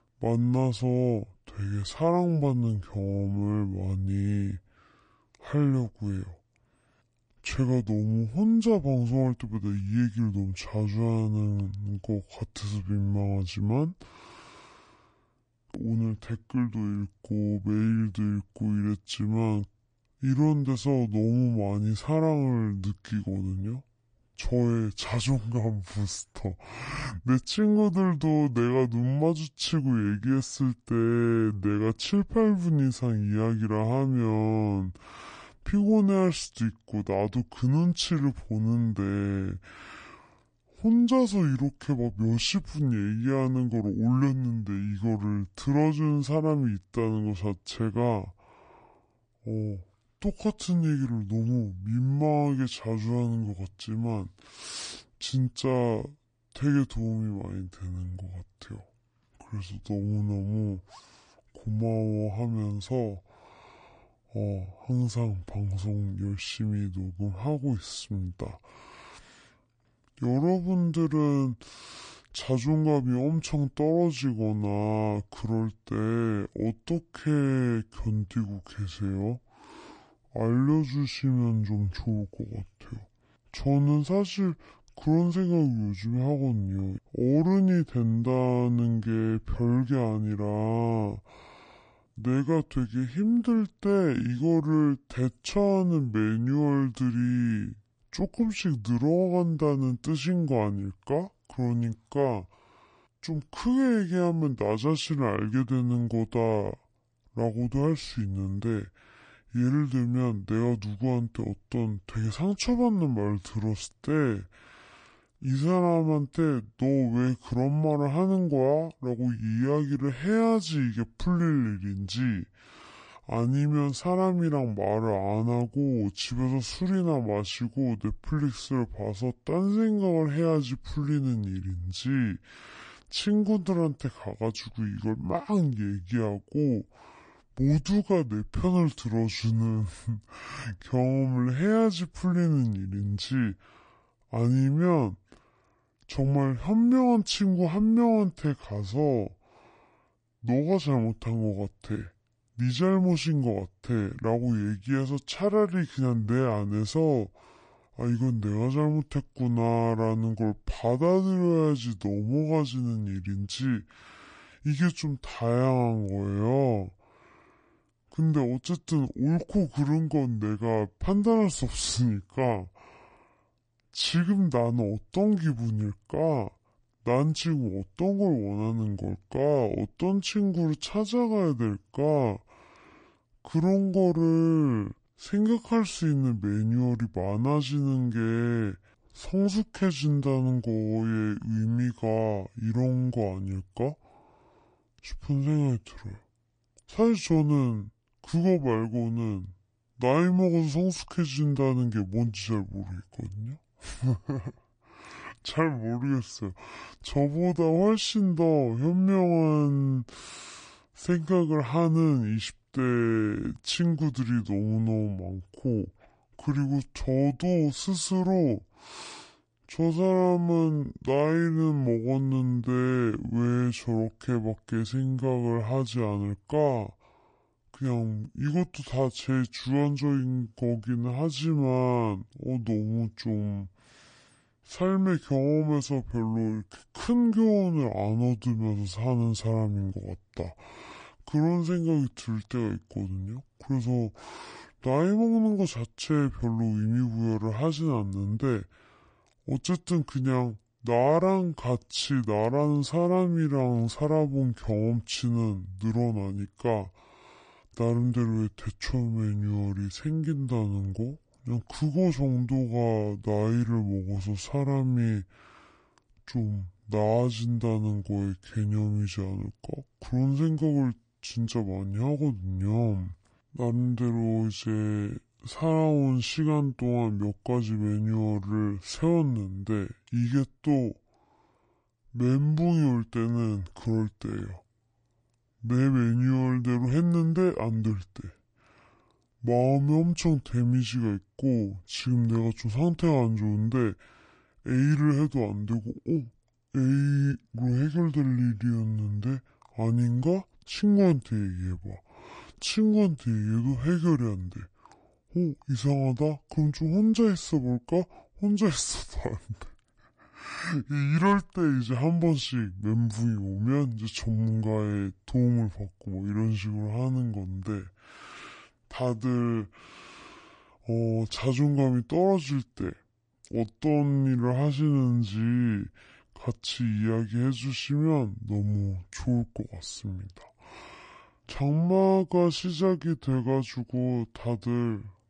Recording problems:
wrong speed and pitch; too slow and too low; 0.6 times normal speed

